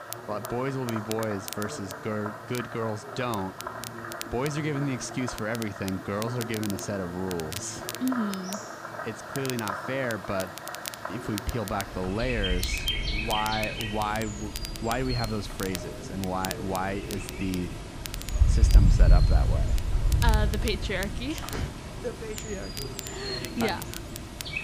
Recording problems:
animal sounds; very loud; throughout; as loud as the speech
crackle, like an old record; loud; 9 dB below the speech
voice in the background; noticeable; throughout; 15 dB below the speech

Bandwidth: 15 kHz